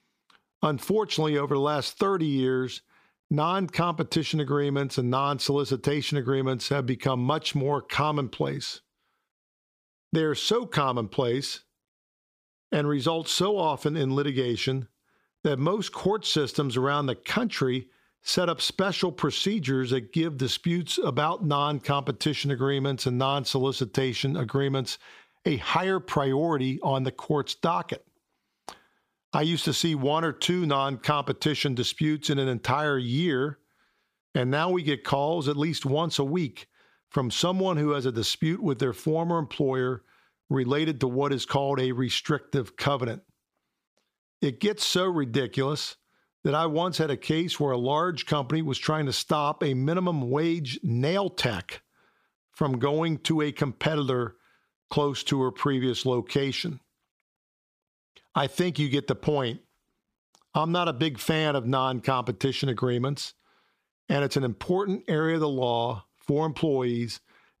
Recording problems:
squashed, flat; somewhat

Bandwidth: 15 kHz